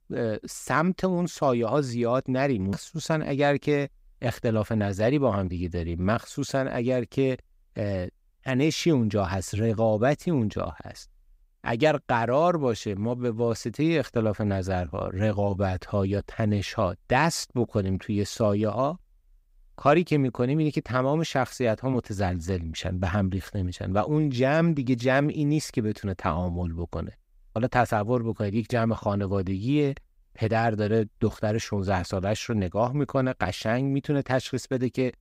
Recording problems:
none

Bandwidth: 15.5 kHz